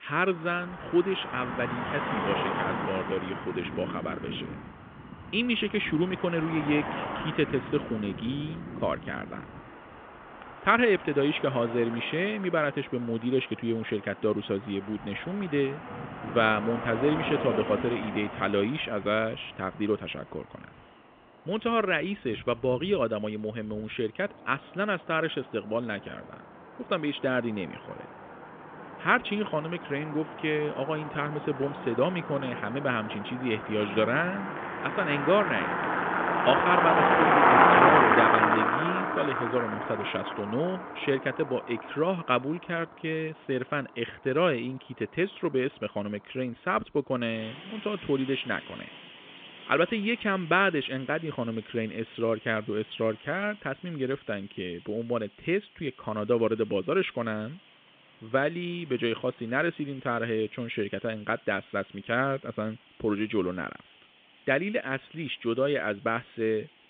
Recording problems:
phone-call audio; nothing above 3.5 kHz
traffic noise; very loud; throughout; 1 dB above the speech

